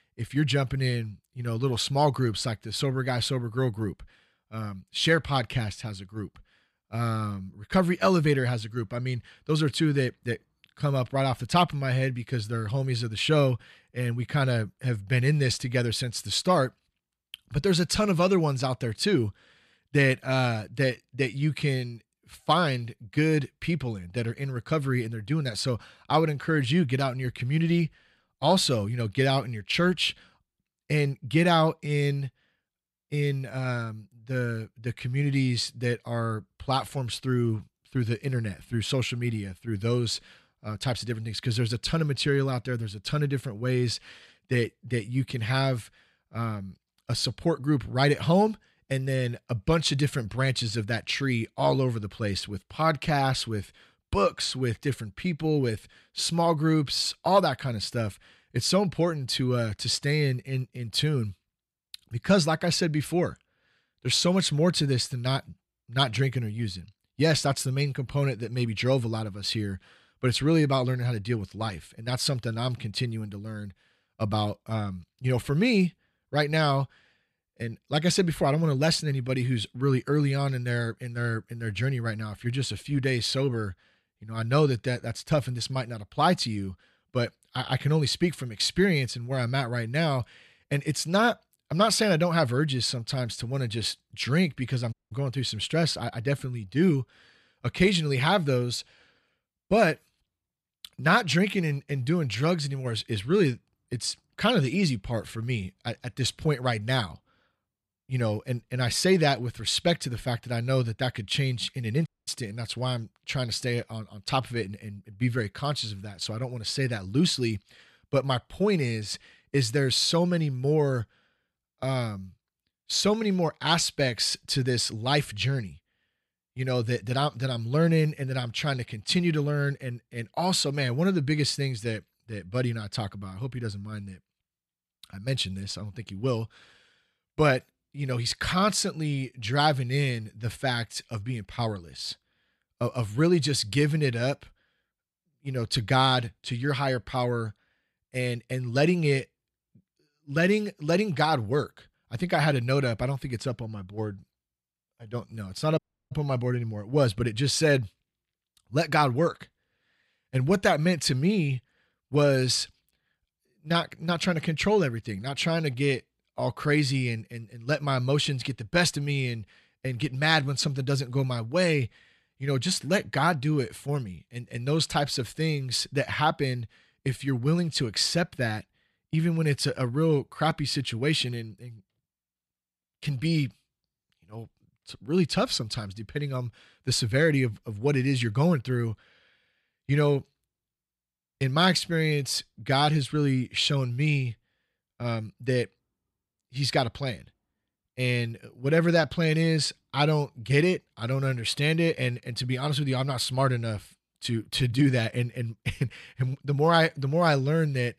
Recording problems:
audio cutting out; at 1:35, at 1:52 and at 2:36

